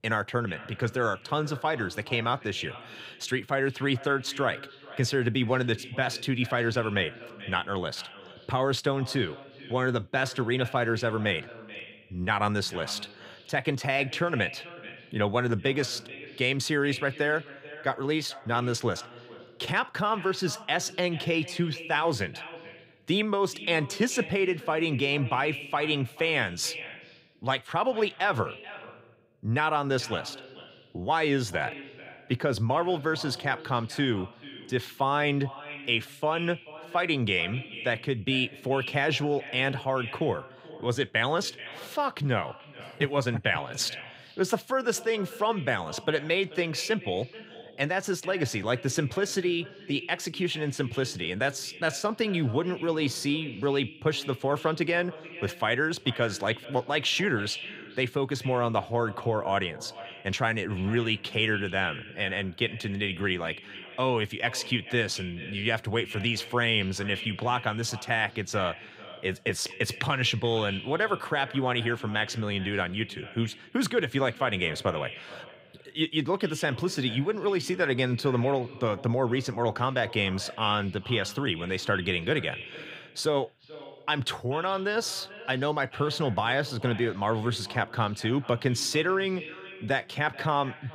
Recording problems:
echo of what is said; noticeable; throughout; 430 ms later, 15 dB below the speech

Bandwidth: 15.5 kHz